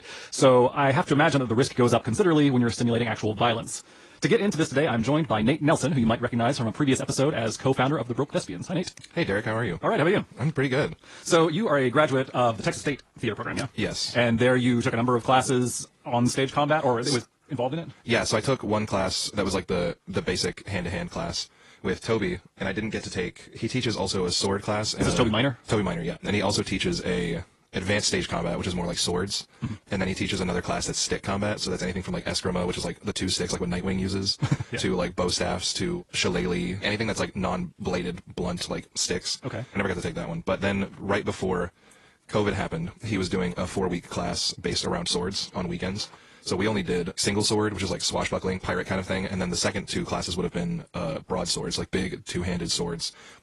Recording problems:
wrong speed, natural pitch; too fast; 1.5 times normal speed
garbled, watery; slightly

